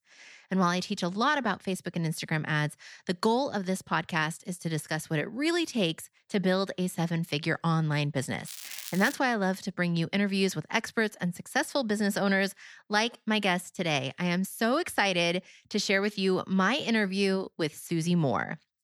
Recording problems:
crackling; noticeable; at 8.5 s; 10 dB below the speech

